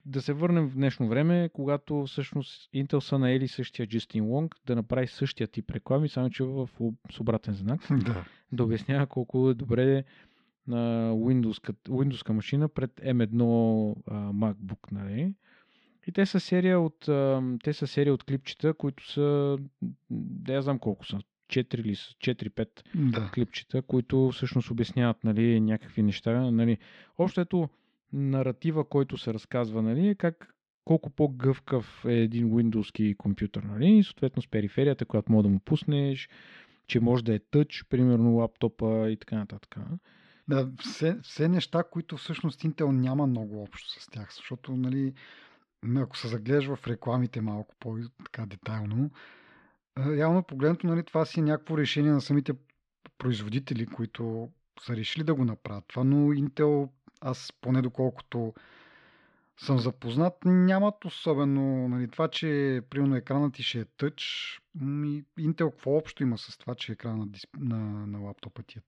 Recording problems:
muffled; slightly; fading above 3.5 kHz

